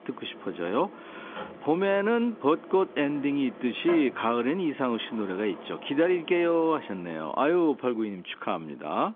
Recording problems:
phone-call audio; nothing above 3.5 kHz
wind in the background; noticeable; throughout; 15 dB below the speech

